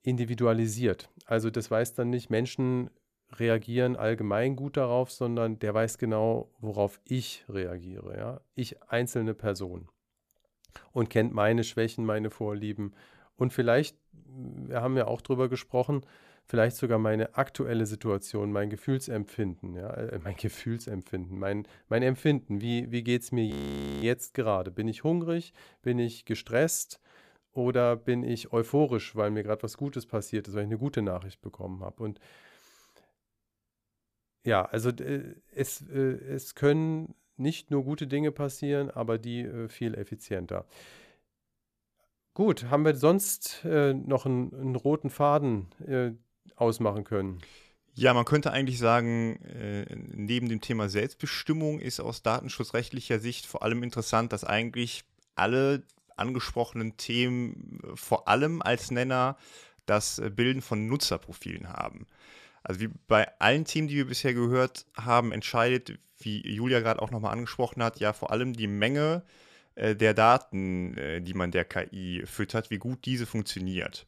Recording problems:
audio freezing; at 24 s for 0.5 s

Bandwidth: 14.5 kHz